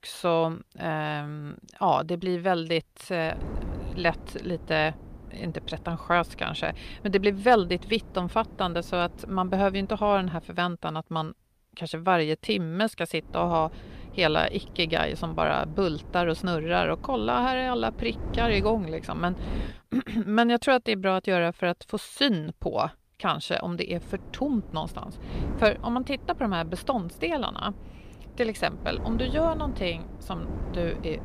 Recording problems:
wind noise on the microphone; occasional gusts; from 3.5 to 10 s, from 13 to 20 s and from 24 s on; 20 dB below the speech

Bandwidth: 15 kHz